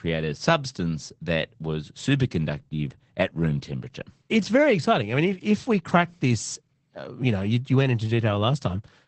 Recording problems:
garbled, watery; badly; nothing above 8 kHz

